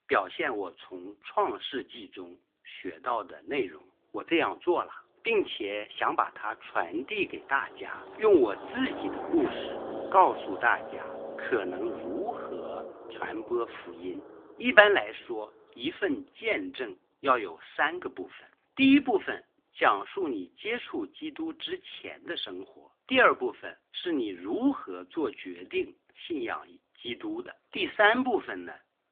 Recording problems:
phone-call audio; nothing above 3.5 kHz
traffic noise; noticeable; throughout; 10 dB below the speech

